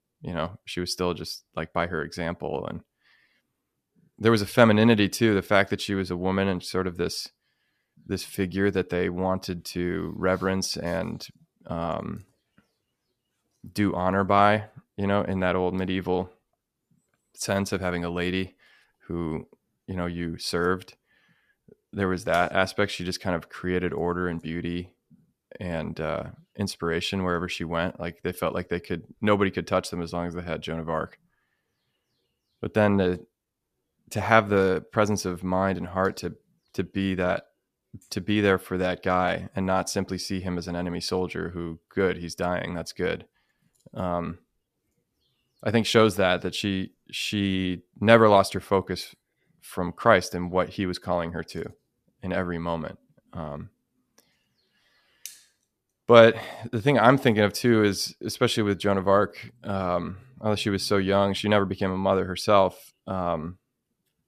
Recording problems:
none

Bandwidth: 14.5 kHz